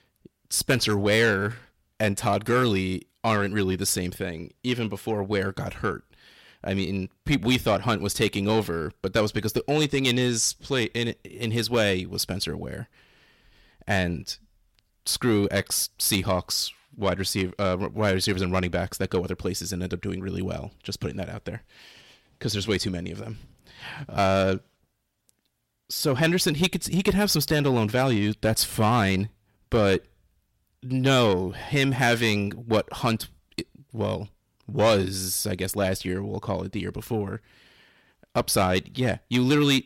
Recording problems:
distortion; slight; 10 dB below the speech

